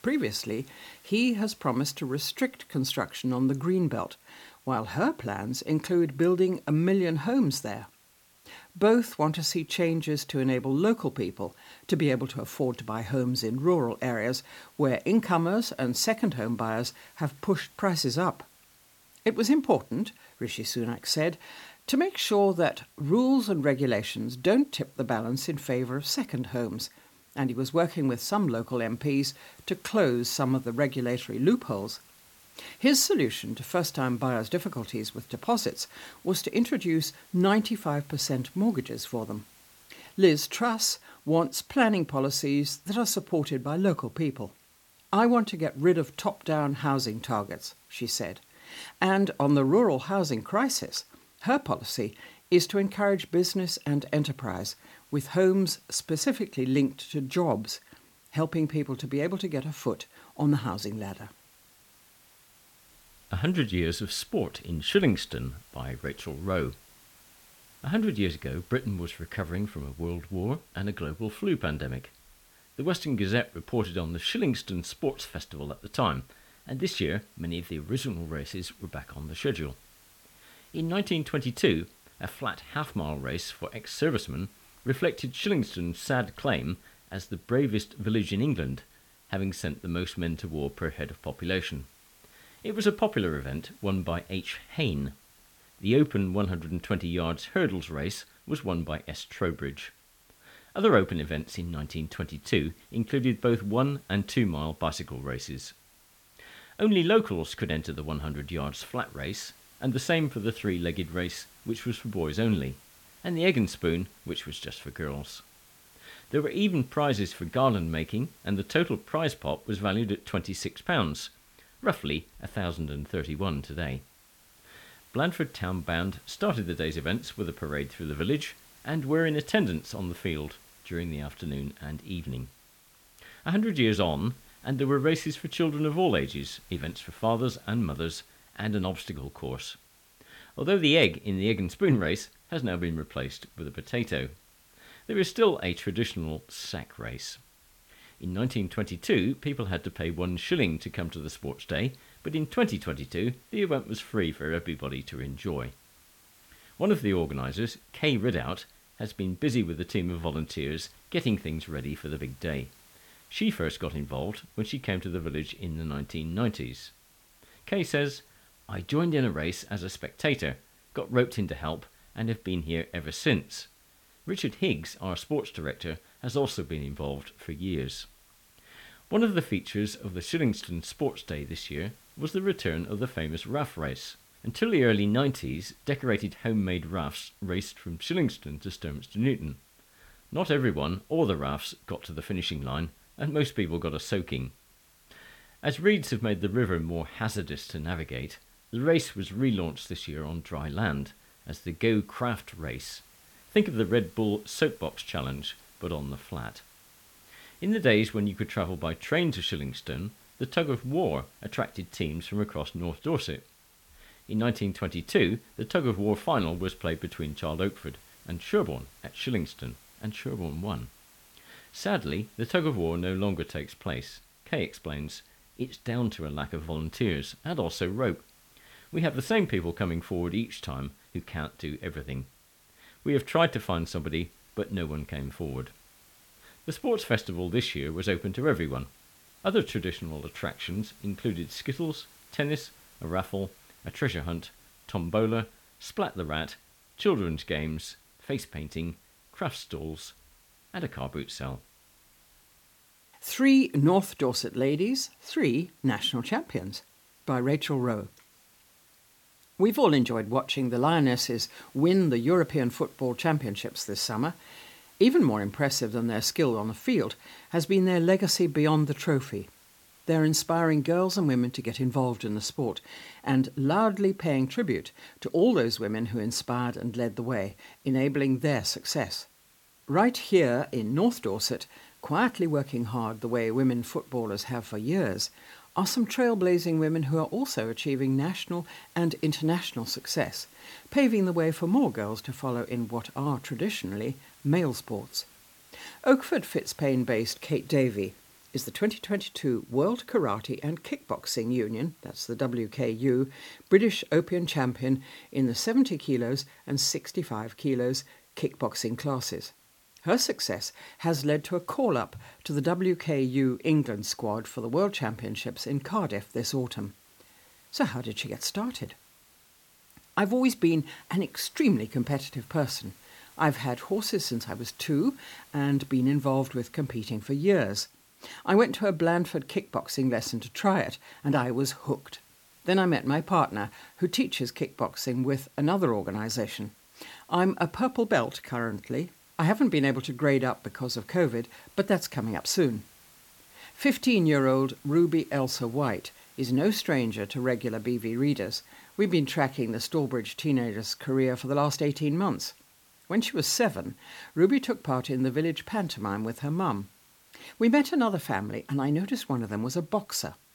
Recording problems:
hiss; faint; throughout; 25 dB below the speech

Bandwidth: 17 kHz